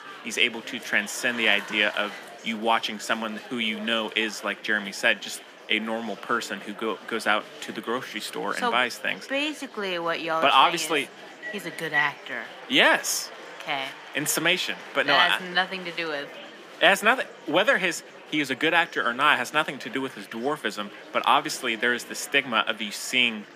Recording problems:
thin; somewhat; fading below 350 Hz
murmuring crowd; noticeable; throughout; 15 dB below the speech
phone ringing; noticeable; at 11 s; peak 1 dB below the speech

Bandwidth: 15 kHz